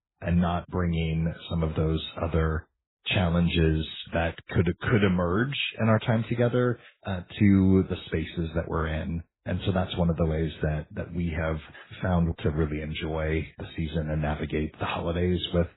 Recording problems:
garbled, watery; badly; nothing above 4 kHz

